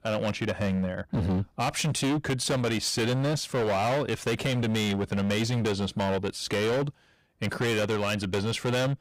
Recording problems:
distortion; heavy; 26% of the sound clipped

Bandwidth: 15.5 kHz